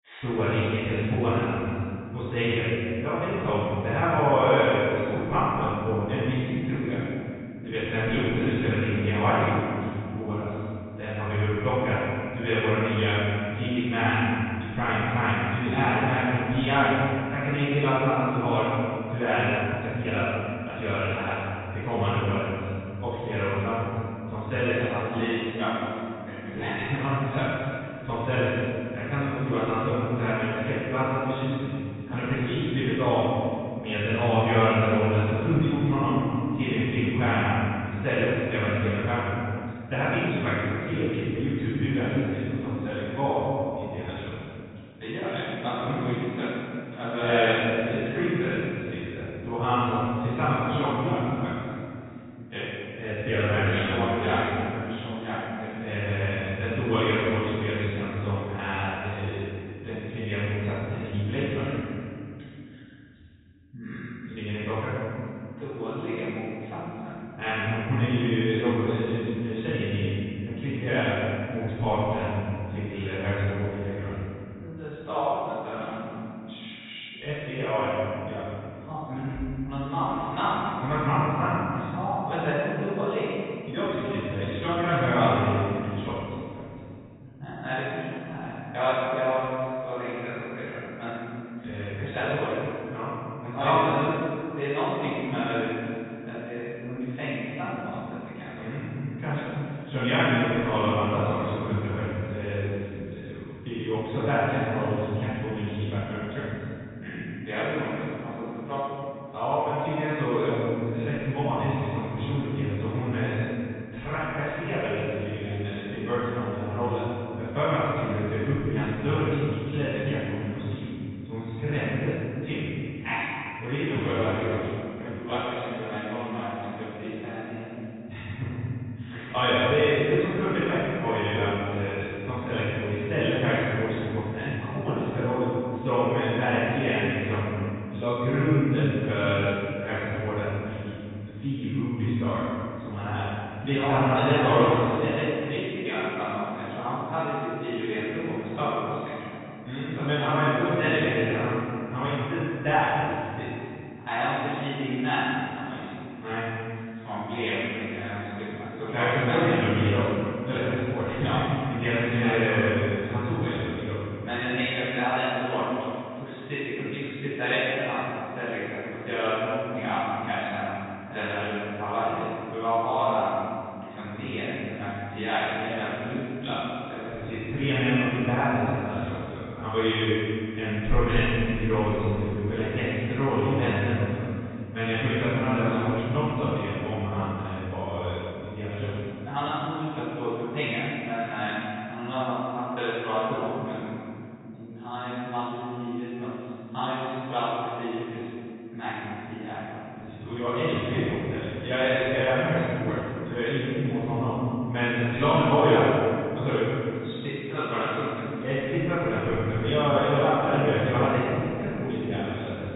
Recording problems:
room echo; strong; dies away in 2.6 s
off-mic speech; far
high frequencies cut off; severe; nothing above 4 kHz
uneven, jittery; strongly; from 7.5 s to 2:04

